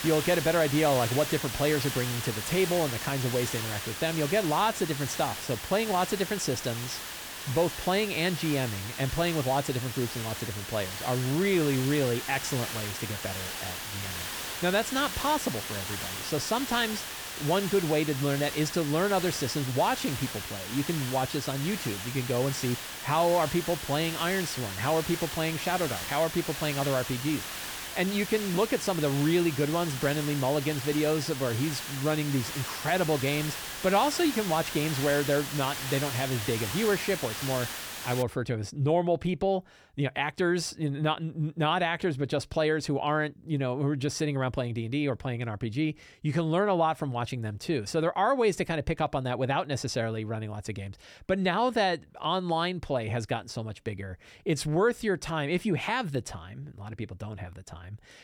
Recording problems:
hiss; loud; until 38 s; 6 dB below the speech

